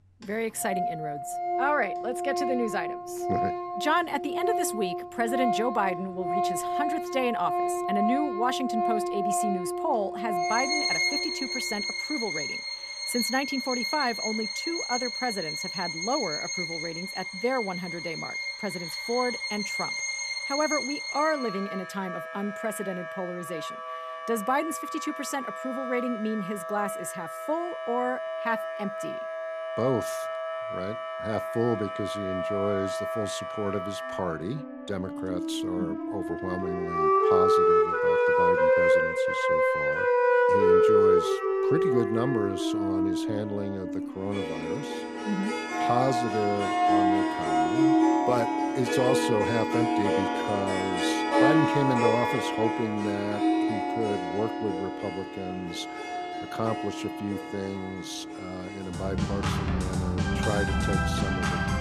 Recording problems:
background music; very loud; throughout; 4 dB above the speech

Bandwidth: 14.5 kHz